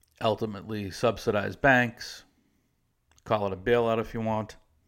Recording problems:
none

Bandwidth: 16 kHz